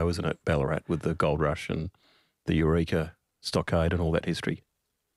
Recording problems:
abrupt cut into speech; at the start

